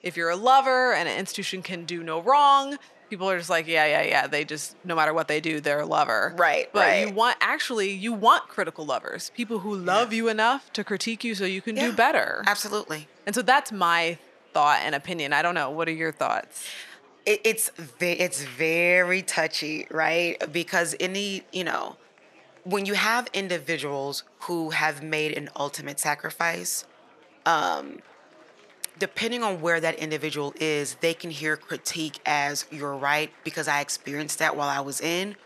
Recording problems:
thin; very slightly; fading below 800 Hz
murmuring crowd; faint; throughout; 30 dB below the speech

